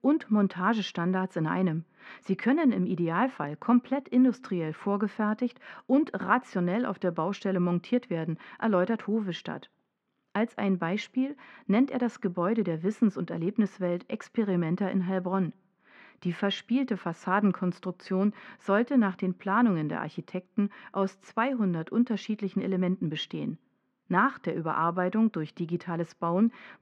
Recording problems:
muffled; very; fading above 2.5 kHz

